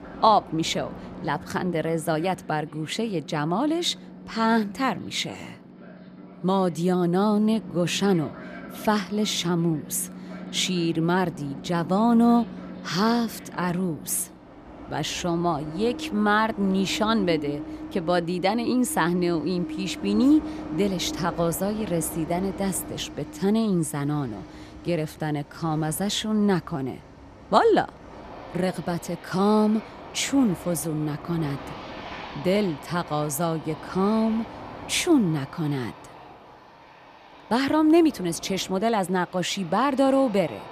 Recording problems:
train or aircraft noise; noticeable; throughout; 15 dB below the speech

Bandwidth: 14.5 kHz